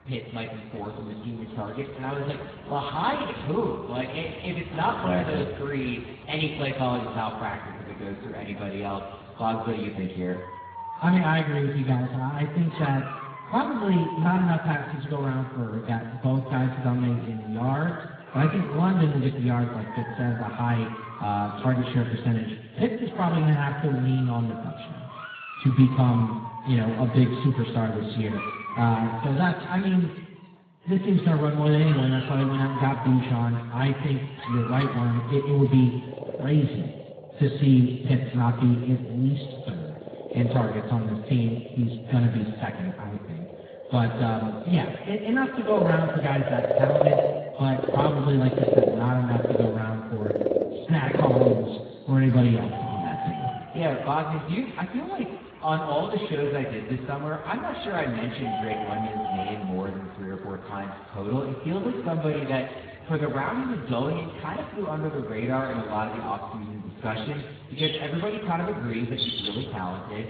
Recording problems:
garbled, watery; badly
room echo; noticeable; dies away in 1.4 s
off-mic speech; somewhat distant
animal sounds; loud; throughout; 6 dB below the speech

